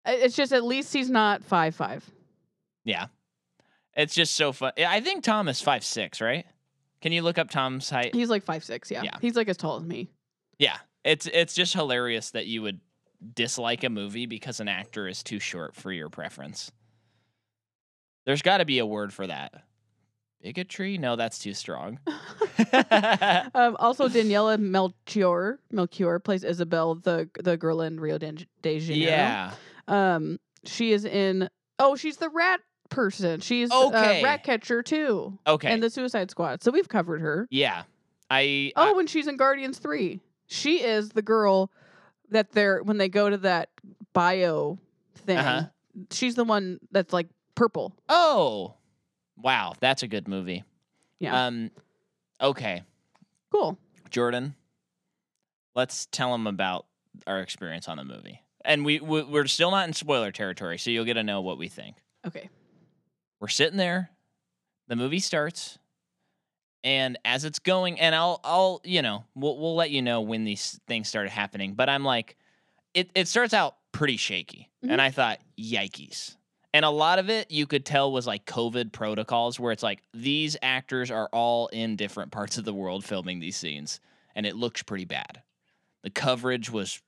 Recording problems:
none

